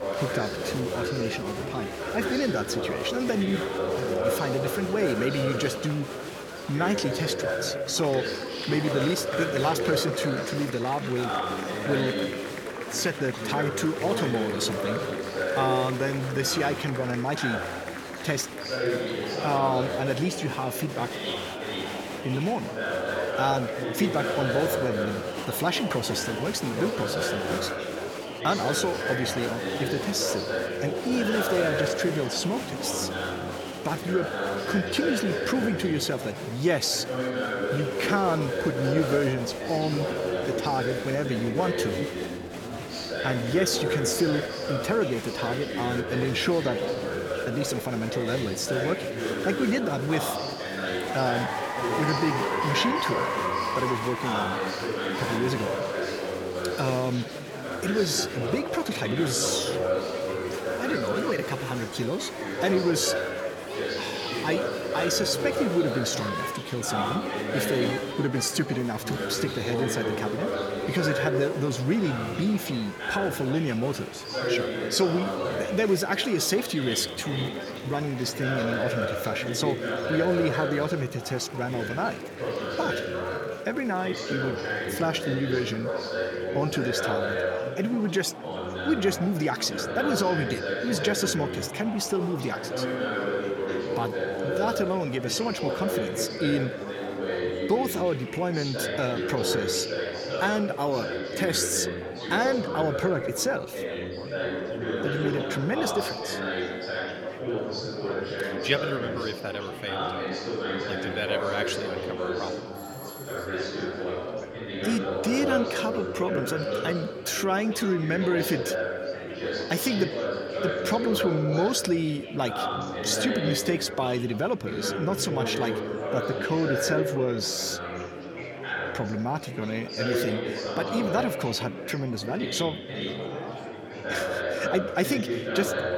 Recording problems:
chatter from many people; loud; throughout; 2 dB below the speech
doorbell; faint; at 1:53; peak 15 dB below the speech

